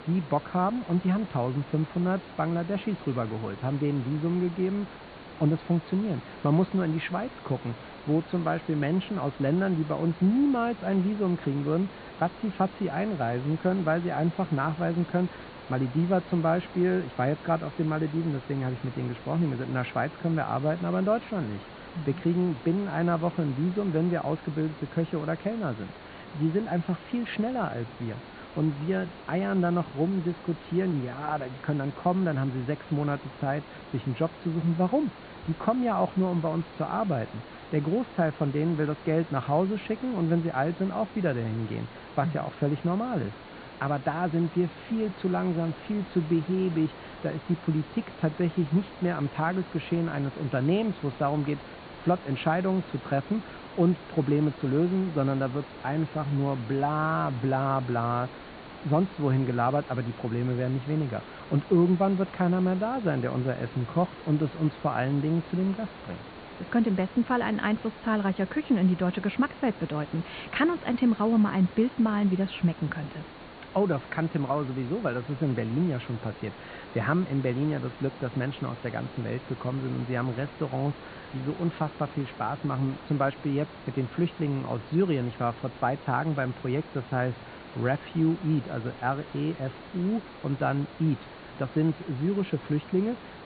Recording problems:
high frequencies cut off; severe; nothing above 4.5 kHz
muffled; very slightly; fading above 3.5 kHz
hiss; noticeable; throughout; 15 dB below the speech

